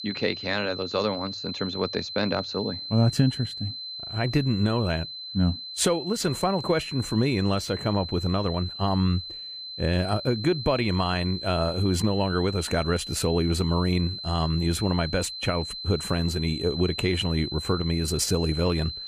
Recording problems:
high-pitched whine; loud; throughout; 4 kHz, 8 dB below the speech

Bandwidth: 15 kHz